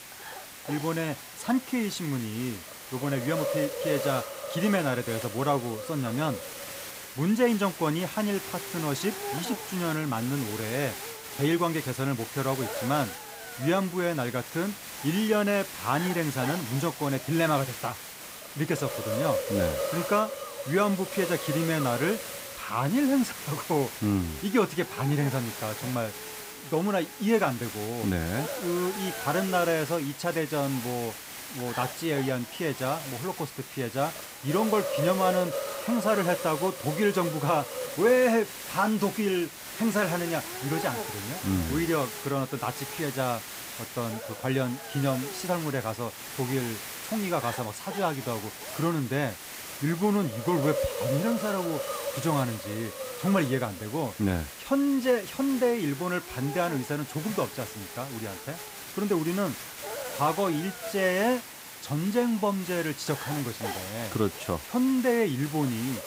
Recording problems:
hiss; loud; throughout; 7 dB below the speech

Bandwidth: 15.5 kHz